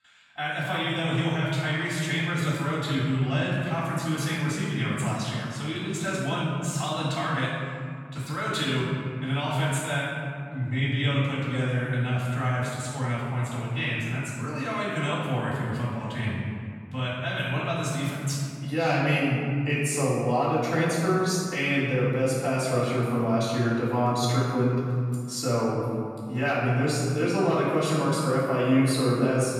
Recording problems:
room echo; strong; dies away in 2 s
off-mic speech; far

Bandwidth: 17 kHz